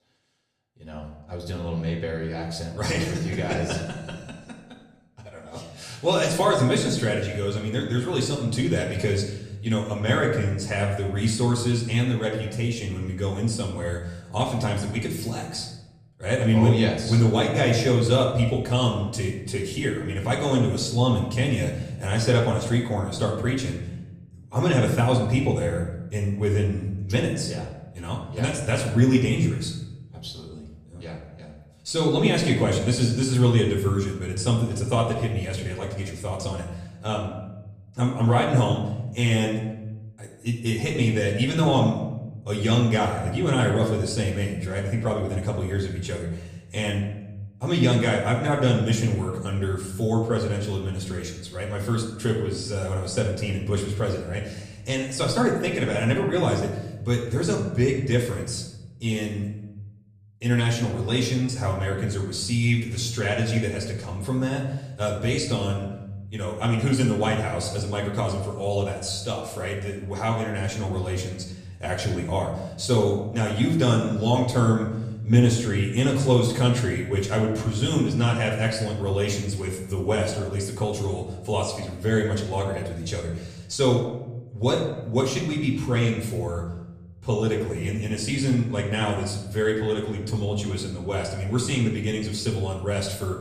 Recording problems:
off-mic speech; far
room echo; noticeable; dies away in 0.9 s
echo of what is said; faint; throughout; 90 ms later, 20 dB below the speech

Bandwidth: 14 kHz